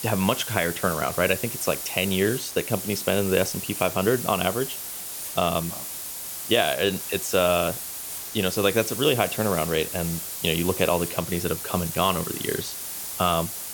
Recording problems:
hiss; loud; throughout; 6 dB below the speech

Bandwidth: 18.5 kHz